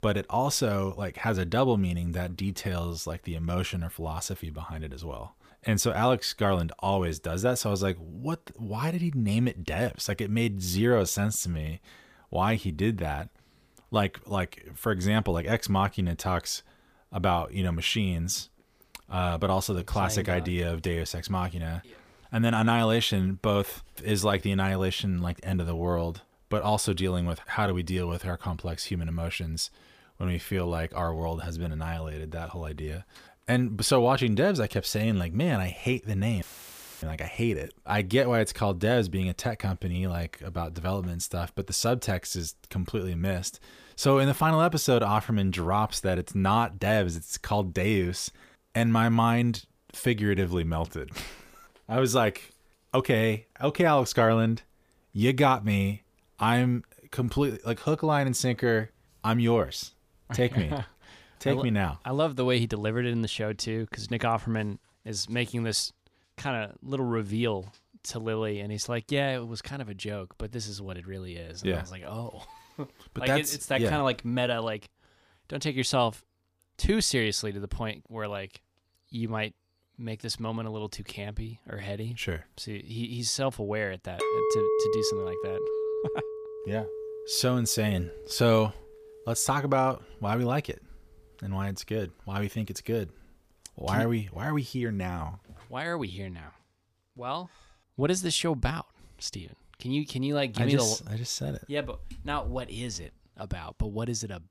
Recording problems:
audio cutting out; filled with static; at 36 s for 0.5 s
clattering dishes; loud; from 1:24 to 1:28; peak 3 dB above the speech

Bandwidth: 15 kHz